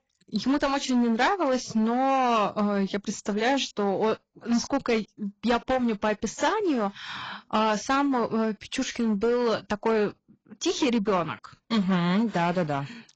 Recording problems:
garbled, watery; badly; nothing above 7.5 kHz
distortion; slight; 9% of the sound clipped

